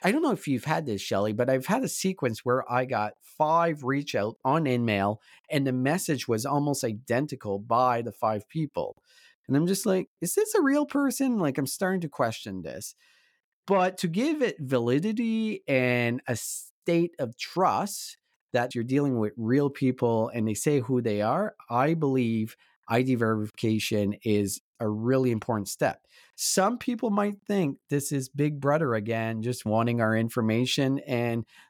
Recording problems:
none

